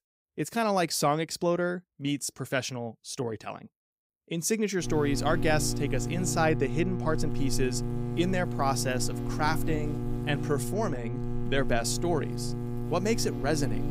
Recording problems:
electrical hum; loud; from 5 s on; 60 Hz, 9 dB below the speech

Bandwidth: 15.5 kHz